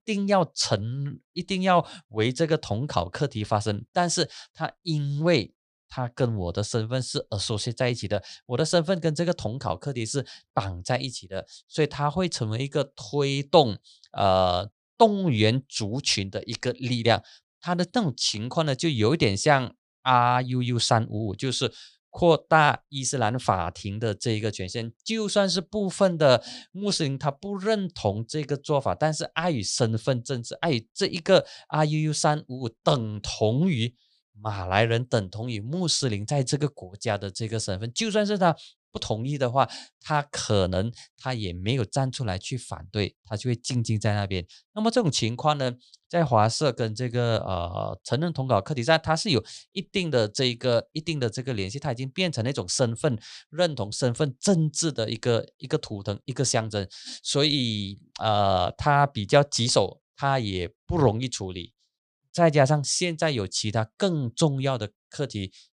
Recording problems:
none

